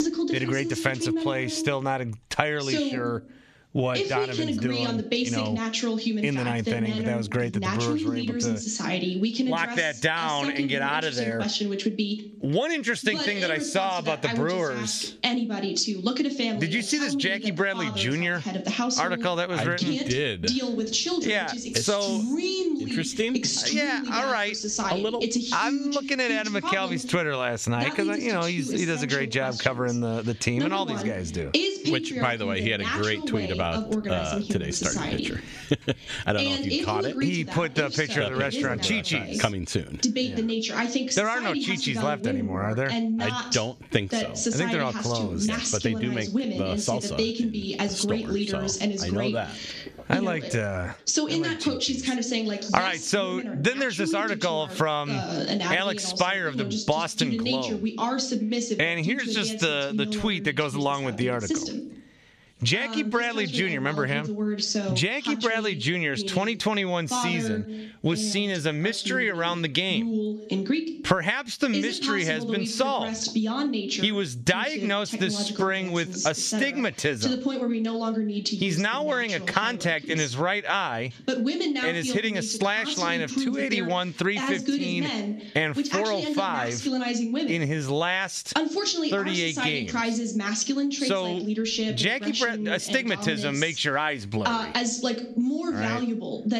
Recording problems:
squashed, flat; somewhat, background pumping
voice in the background; loud; throughout; 2 dB below the speech

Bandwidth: 14.5 kHz